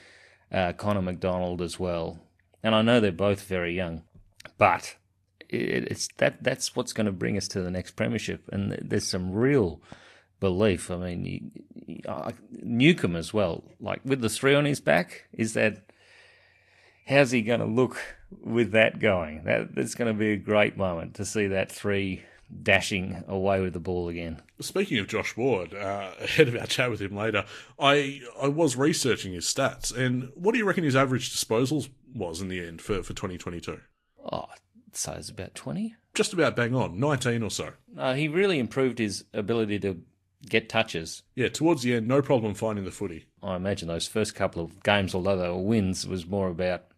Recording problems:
garbled, watery; slightly; nothing above 12.5 kHz

